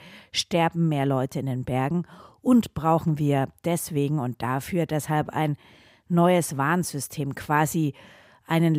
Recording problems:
abrupt cut into speech; at the end

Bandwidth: 15.5 kHz